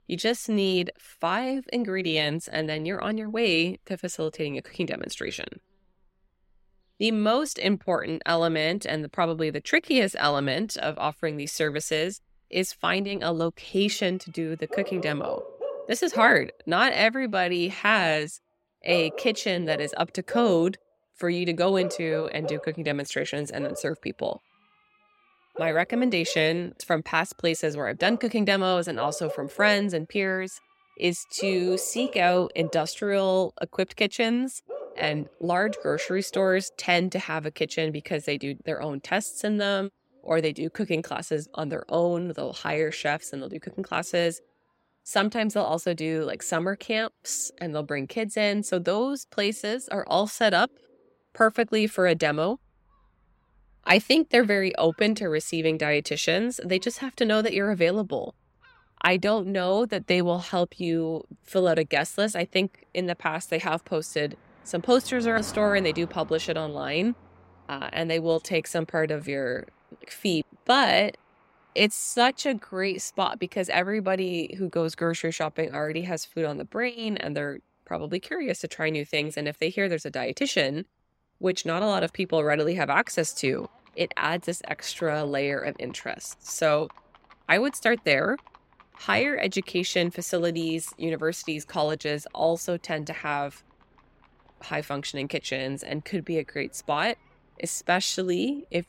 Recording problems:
animal sounds; noticeable; throughout; 15 dB below the speech

